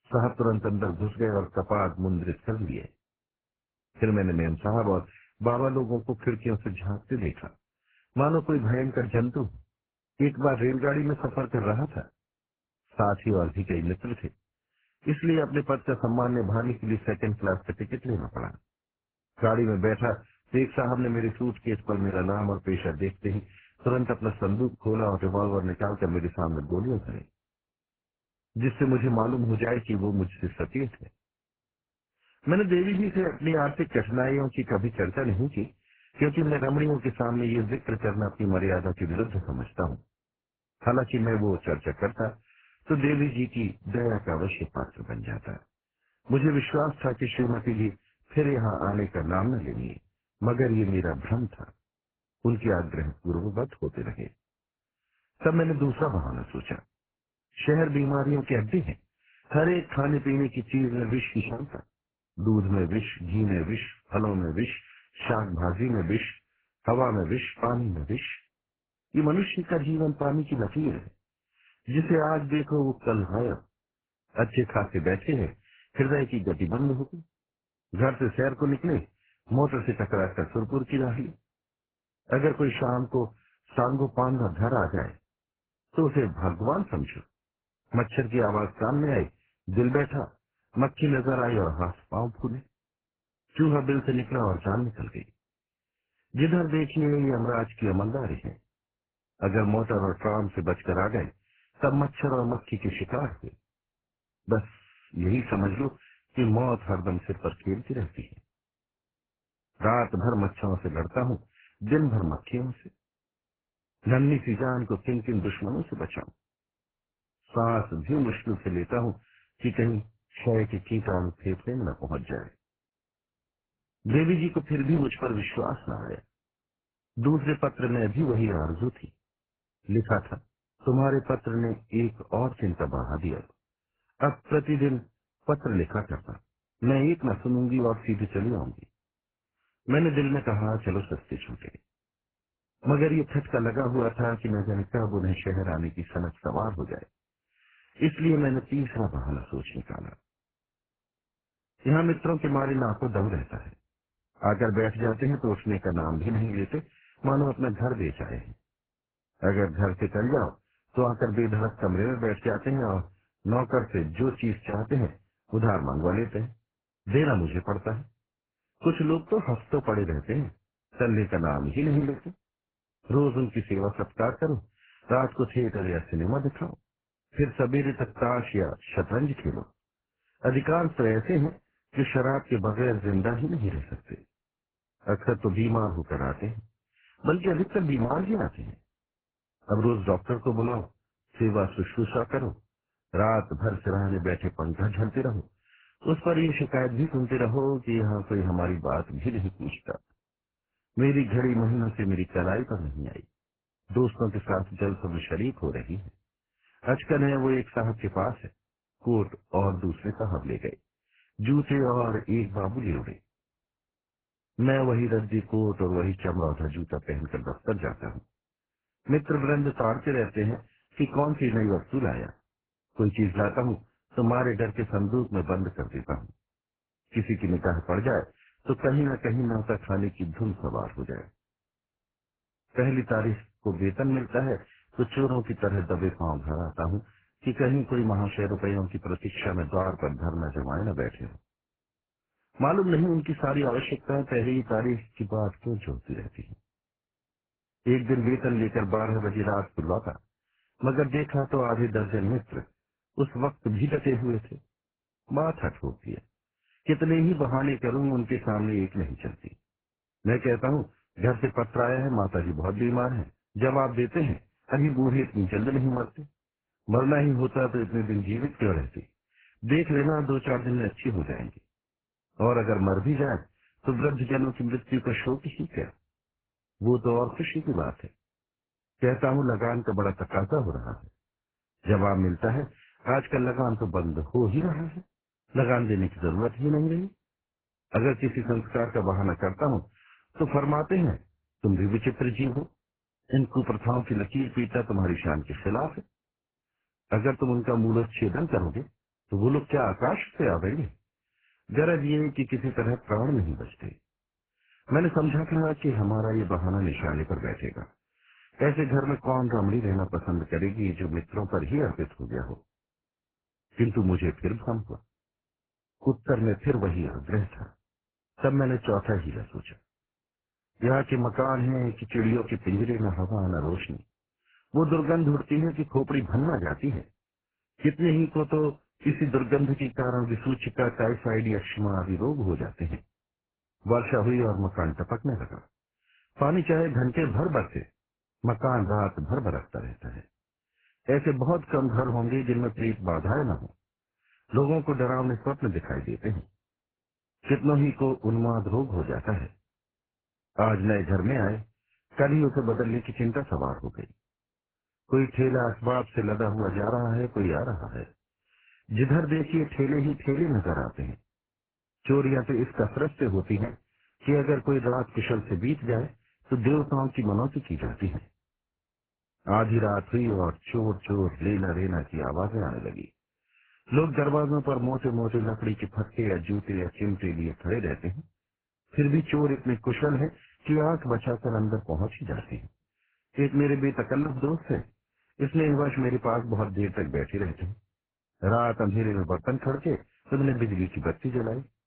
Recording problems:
garbled, watery; badly; nothing above 4 kHz

